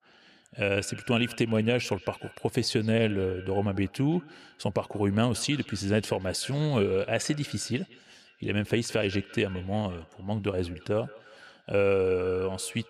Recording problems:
echo of what is said; faint; throughout; 170 ms later, 20 dB below the speech

